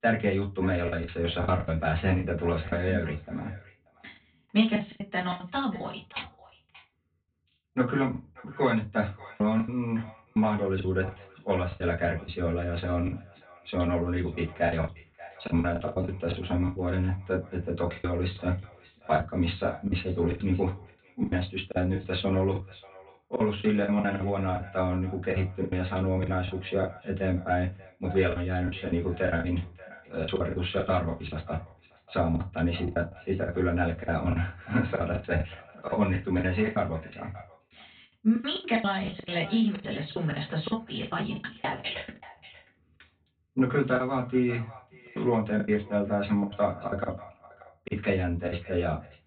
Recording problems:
off-mic speech; far
high frequencies cut off; severe; nothing above 4 kHz
echo of what is said; faint; throughout; 580 ms later, 20 dB below the speech
room echo; very slight; dies away in 0.2 s
choppy; very; 14% of the speech affected

